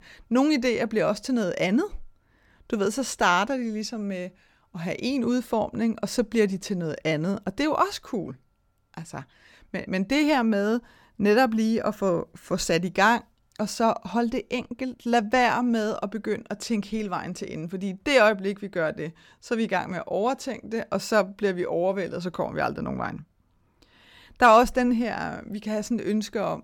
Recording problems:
none

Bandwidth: 18 kHz